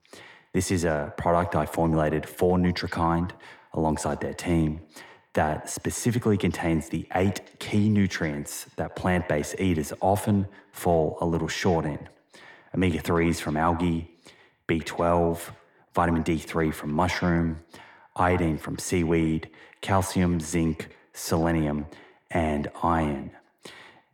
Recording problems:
echo of what is said; noticeable; throughout; 110 ms later, 15 dB below the speech

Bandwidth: 18.5 kHz